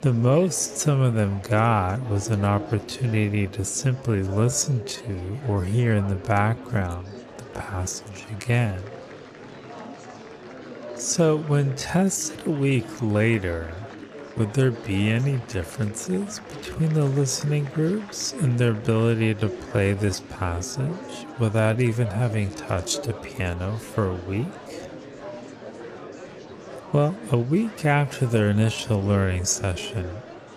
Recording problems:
wrong speed, natural pitch; too slow; 0.6 times normal speed
murmuring crowd; noticeable; throughout; 15 dB below the speech

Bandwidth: 14.5 kHz